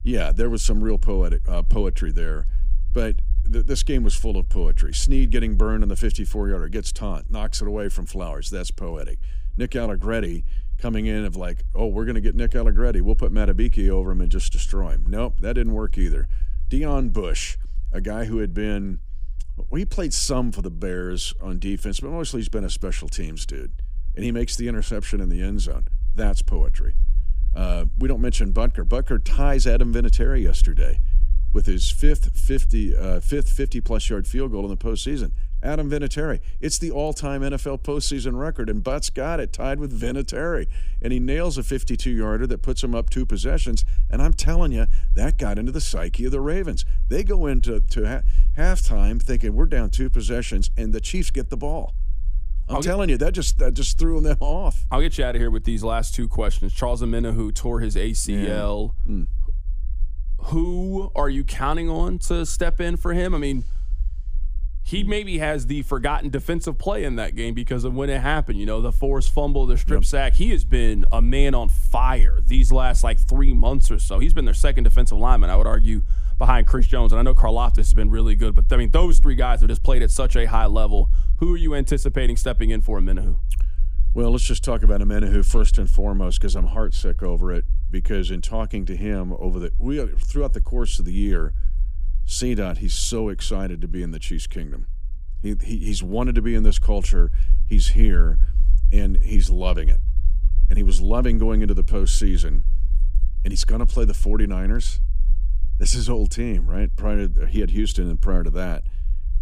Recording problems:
low rumble; faint; throughout; 25 dB below the speech

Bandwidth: 15 kHz